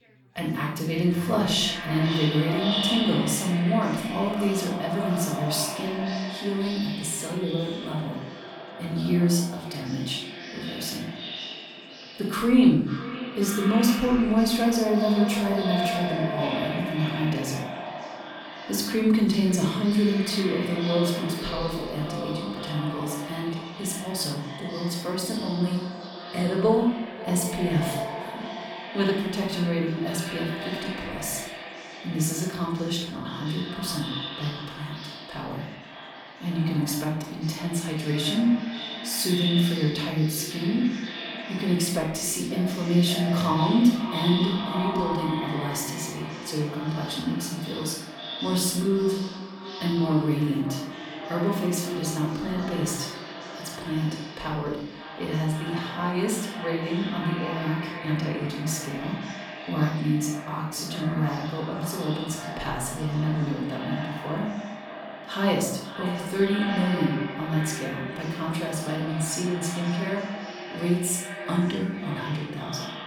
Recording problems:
echo of what is said; strong; throughout; 540 ms later, 8 dB below the speech
off-mic speech; far
room echo; noticeable; dies away in 0.6 s
background chatter; faint; throughout; 4 voices, 30 dB below the speech

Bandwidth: 18 kHz